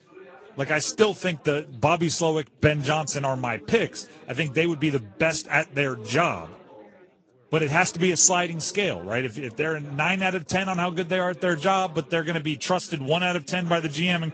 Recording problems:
garbled, watery; slightly; nothing above 7.5 kHz
chatter from many people; faint; throughout; 25 dB below the speech

